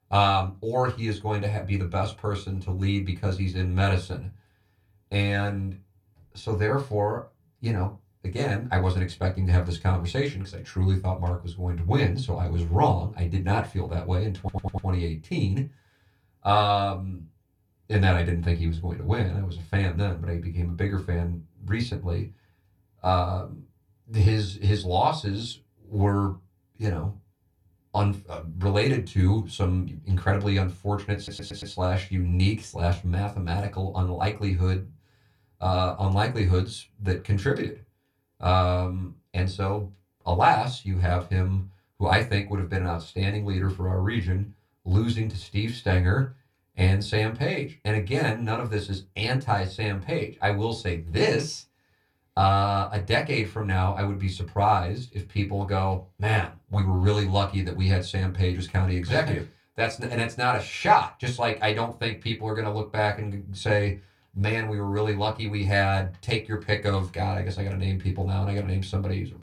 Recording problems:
room echo; very slight; dies away in 0.2 s
off-mic speech; somewhat distant
audio stuttering; at 14 s and at 31 s

